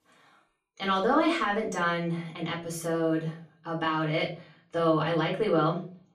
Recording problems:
off-mic speech; far
room echo; slight; dies away in 0.4 s

